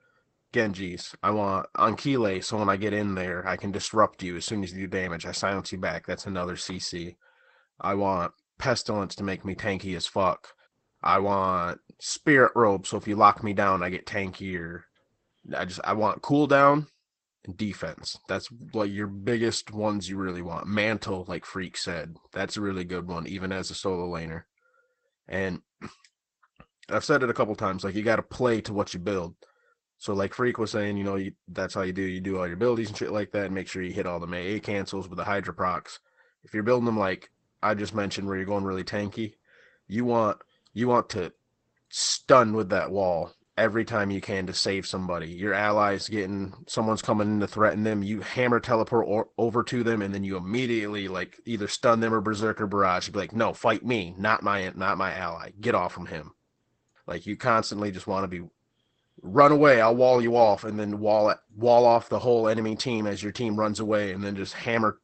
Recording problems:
garbled, watery; badly; nothing above 8 kHz

